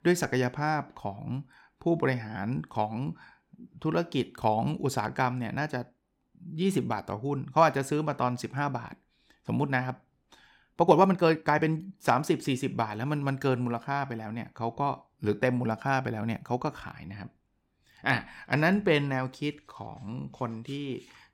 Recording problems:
uneven, jittery; strongly; from 5.5 to 20 s

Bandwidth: 17 kHz